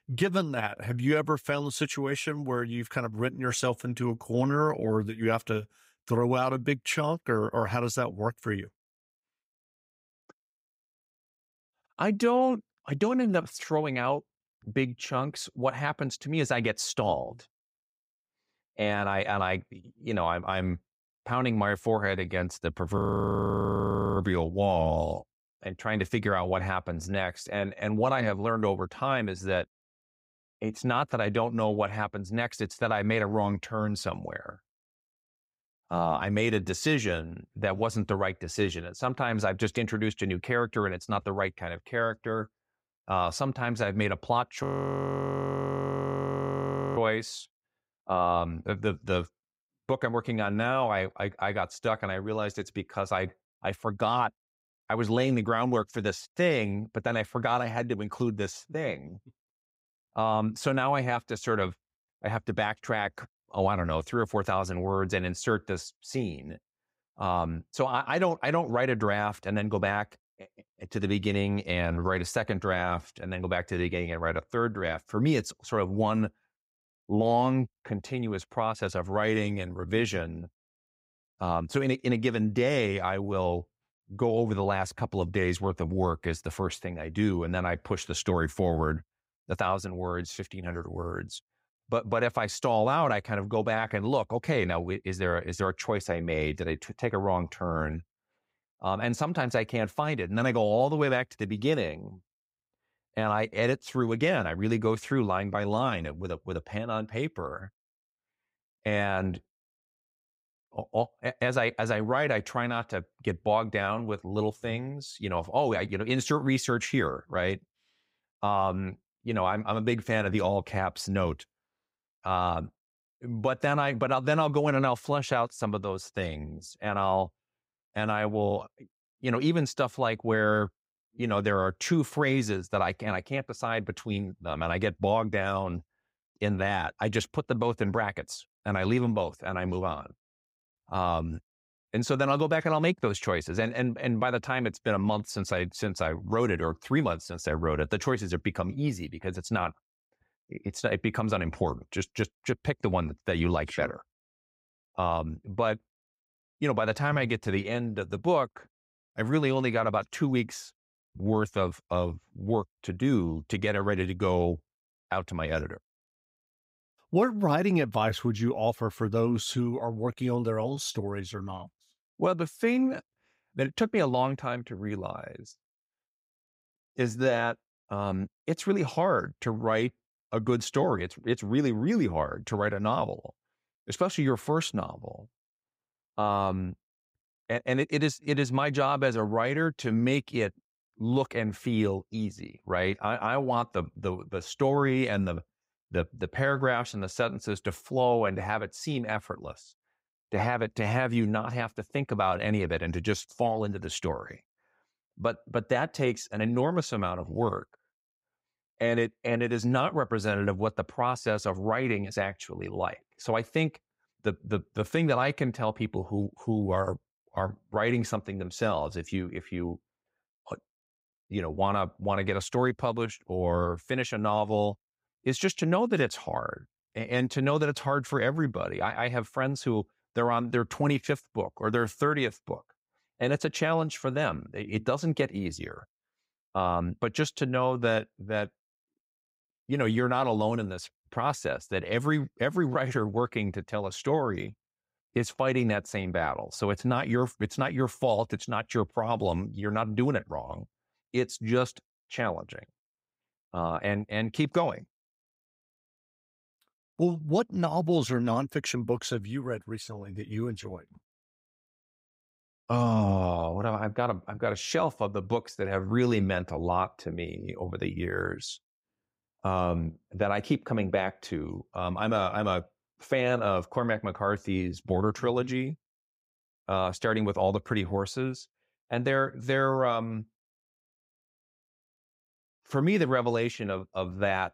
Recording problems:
audio freezing; at 23 s for 1 s and at 45 s for 2.5 s

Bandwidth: 15.5 kHz